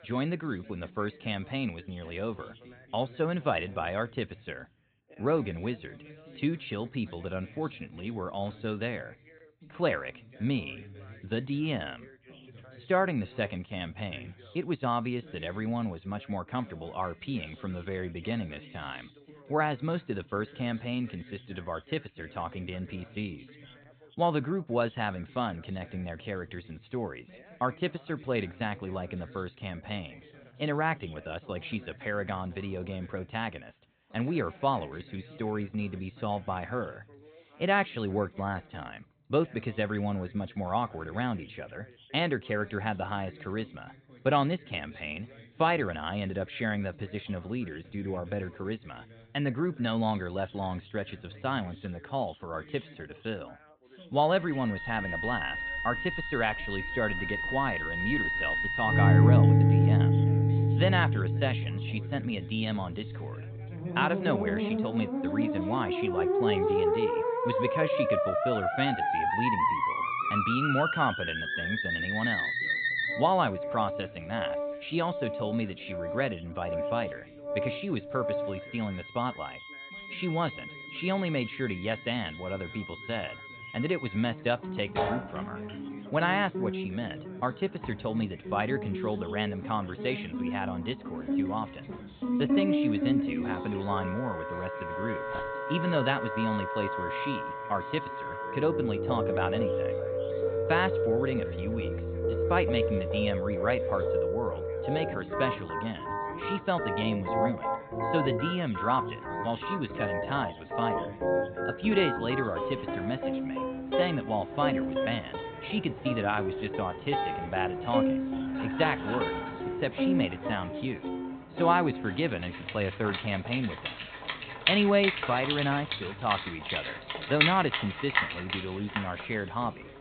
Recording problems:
high frequencies cut off; severe; nothing above 4 kHz
background music; very loud; from 55 s on; 2 dB above the speech
background chatter; noticeable; throughout; 2 voices, 20 dB below the speech
dog barking; faint; at 1:35; peak 15 dB below the speech

